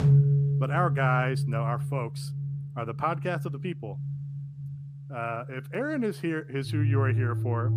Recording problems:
background music; very loud; throughout; 2 dB above the speech

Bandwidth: 15 kHz